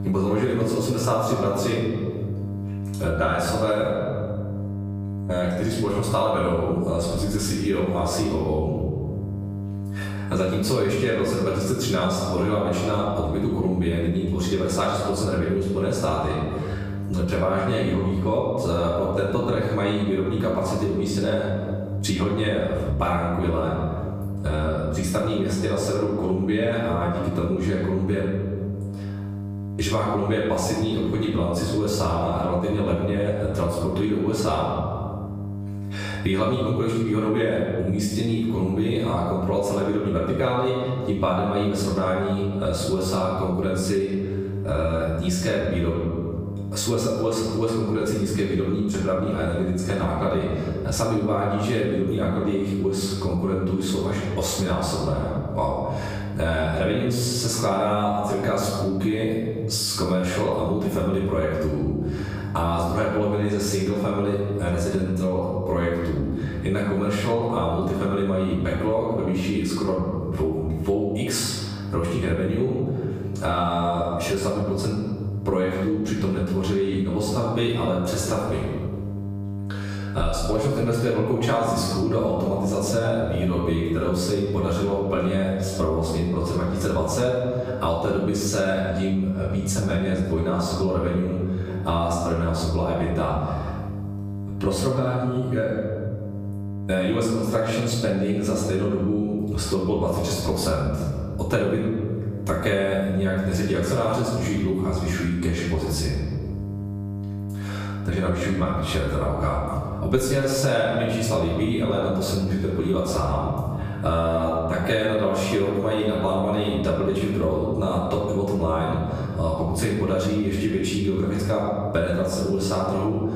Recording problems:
off-mic speech; far
room echo; noticeable; dies away in 0.9 s
squashed, flat; somewhat
electrical hum; faint; throughout; 50 Hz, 20 dB below the speech

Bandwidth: 15 kHz